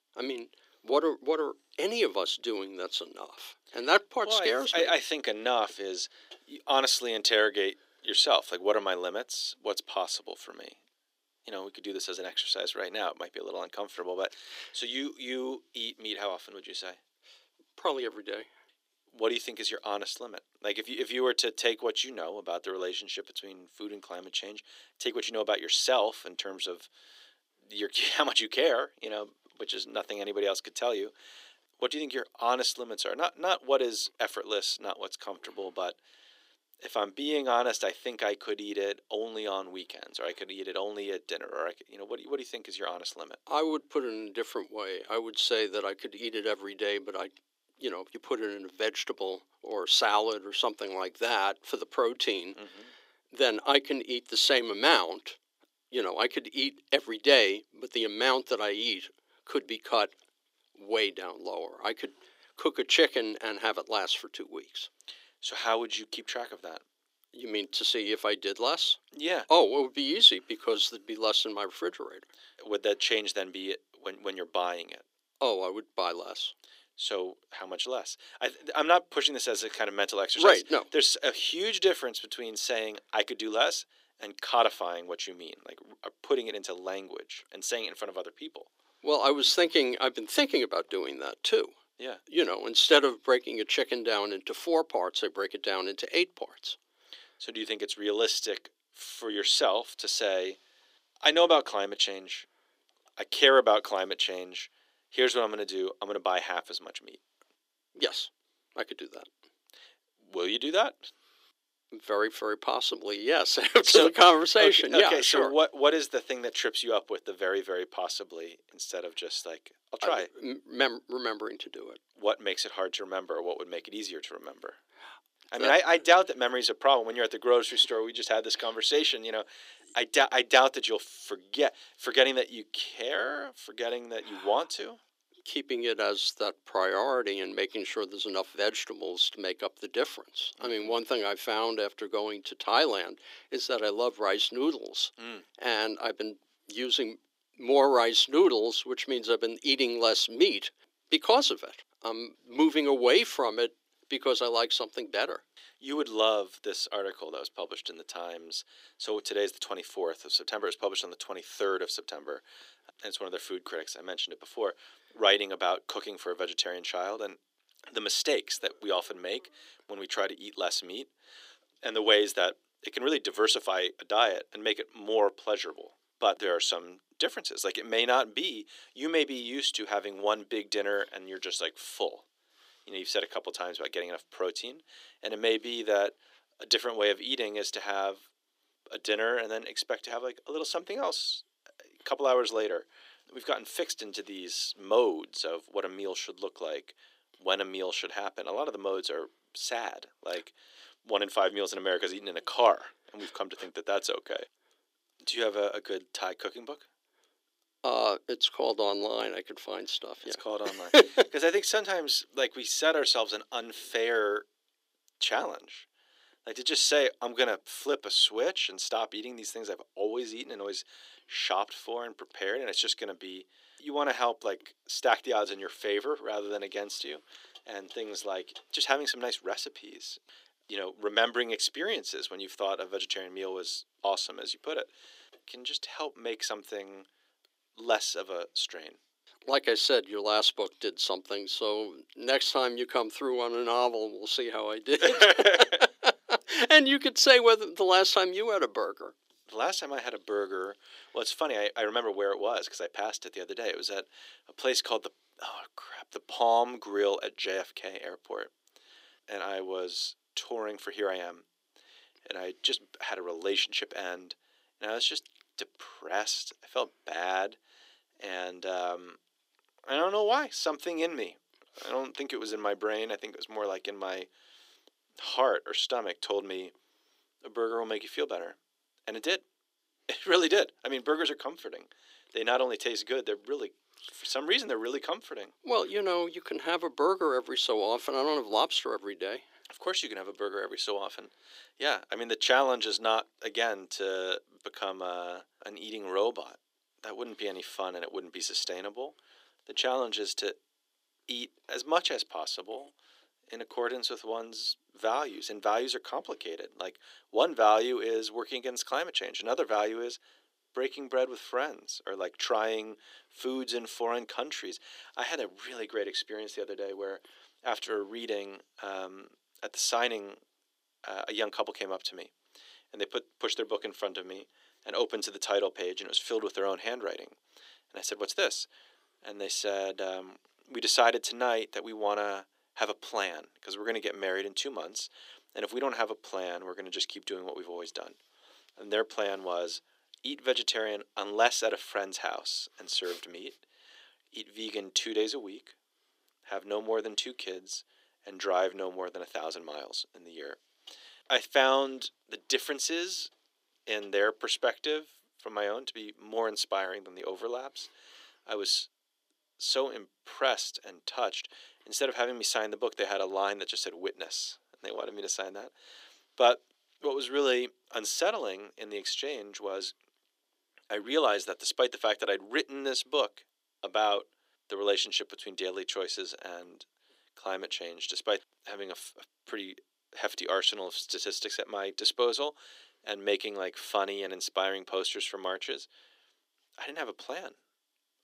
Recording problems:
thin; somewhat; fading below 300 Hz

